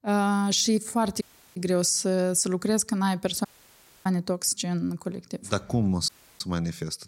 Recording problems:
audio cutting out; at 1 s, at 3.5 s for 0.5 s and at 6 s

